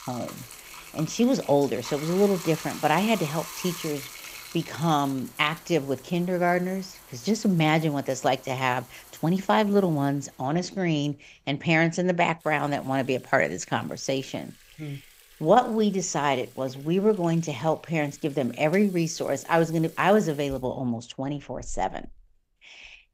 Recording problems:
household noises; noticeable; throughout; 20 dB below the speech

